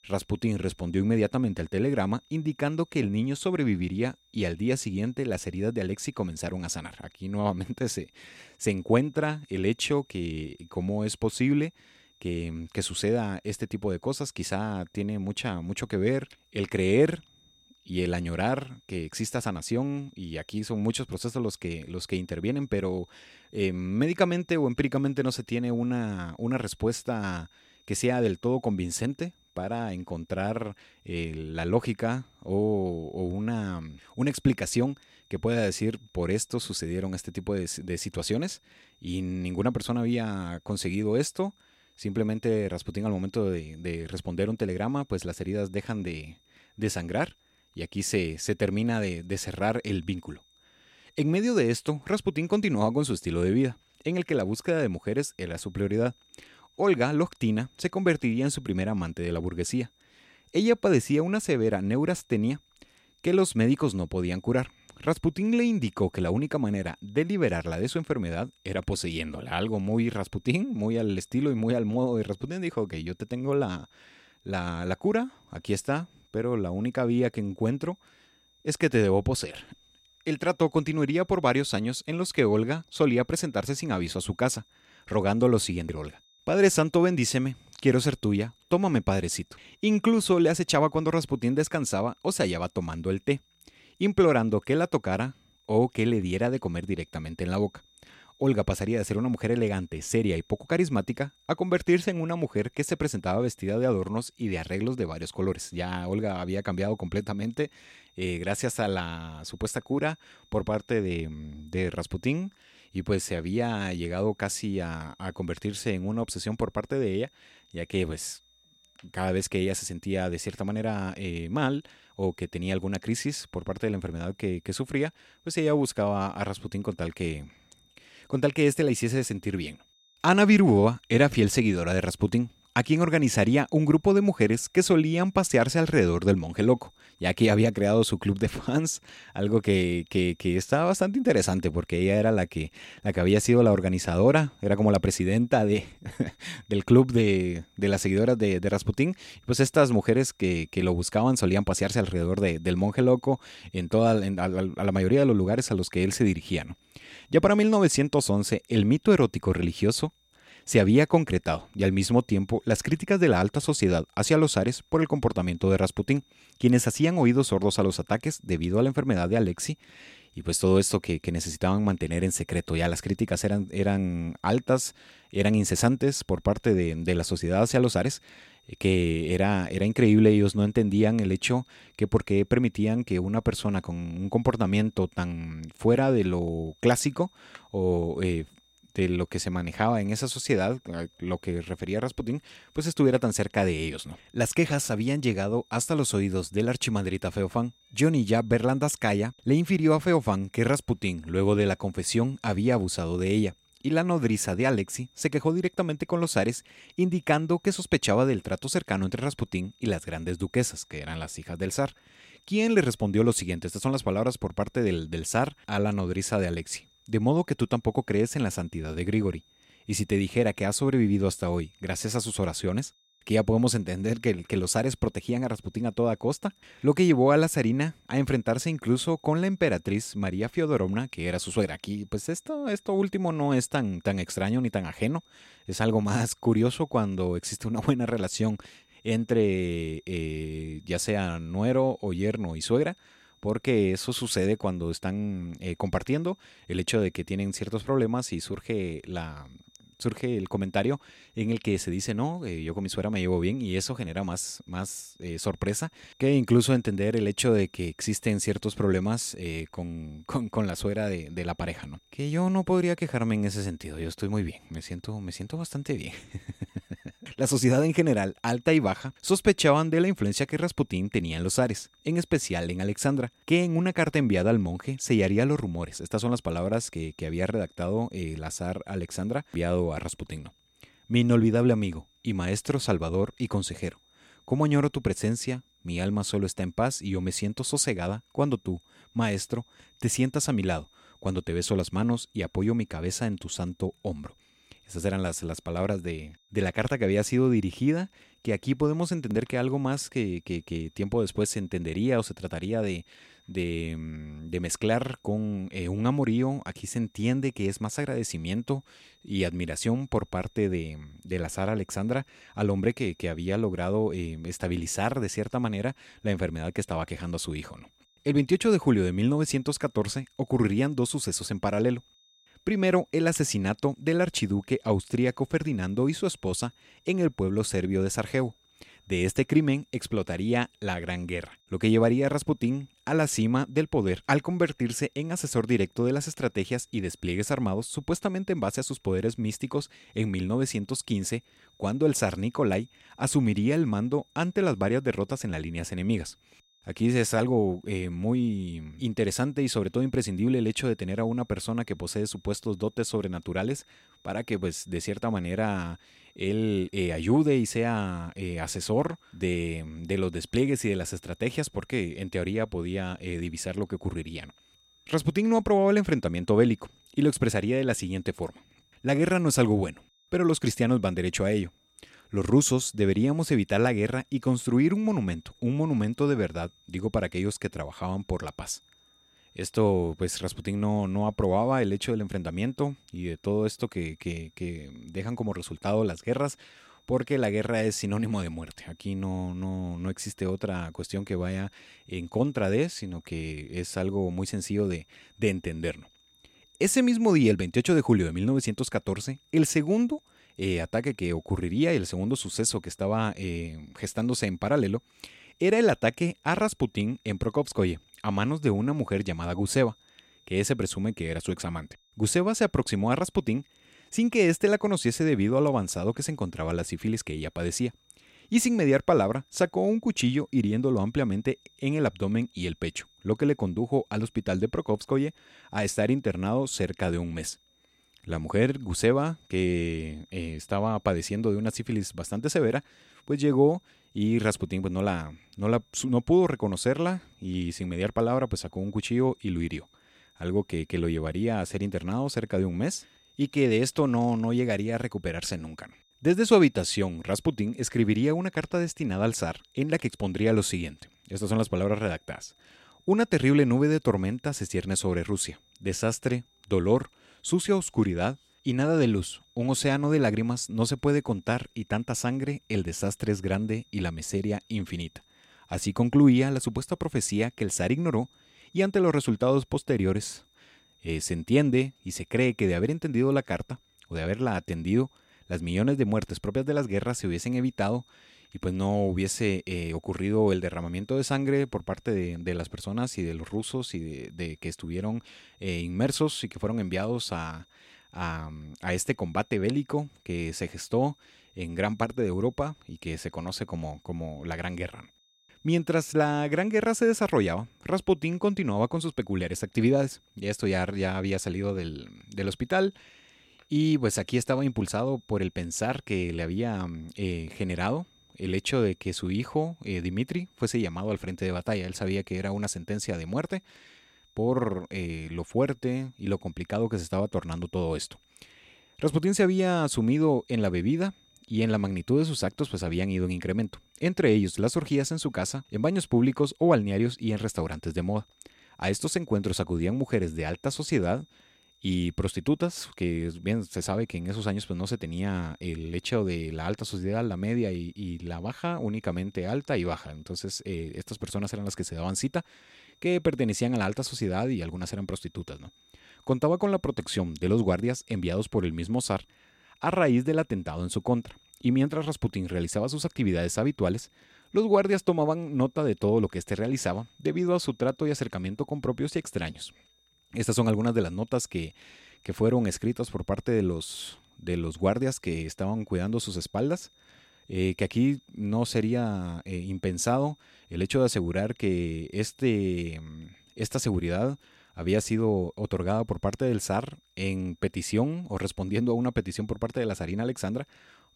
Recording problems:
high-pitched whine; faint; throughout; 3.5 kHz, 35 dB below the speech

